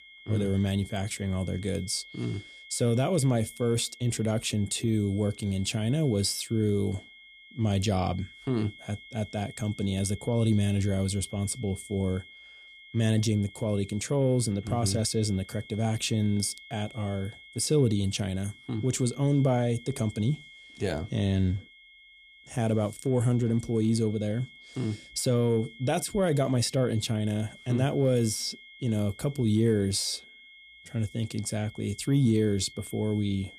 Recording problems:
high-pitched whine; noticeable; throughout; 2 kHz, 20 dB below the speech

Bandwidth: 14 kHz